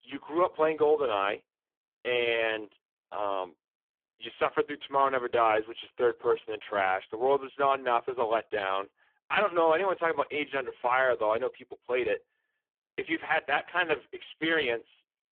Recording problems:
phone-call audio; poor line; nothing above 3.5 kHz

